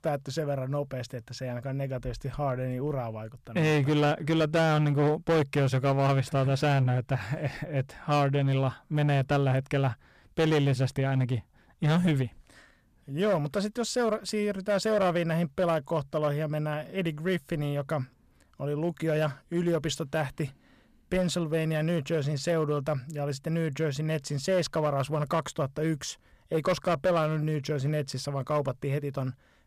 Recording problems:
distortion; slight; 6% of the sound clipped

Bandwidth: 14.5 kHz